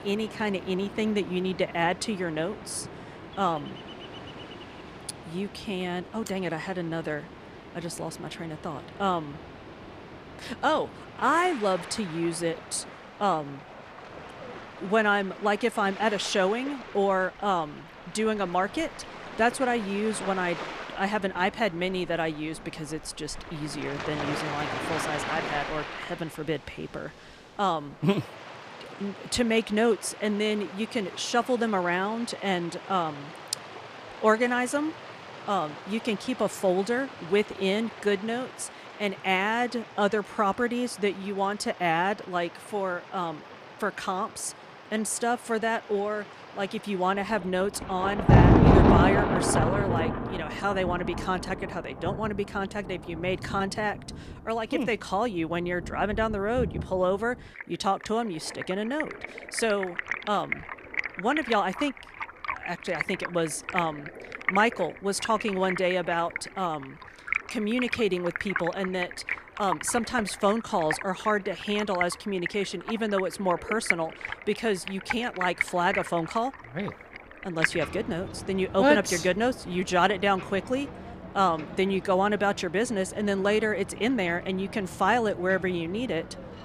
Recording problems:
rain or running water; loud; throughout; 5 dB below the speech

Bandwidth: 14.5 kHz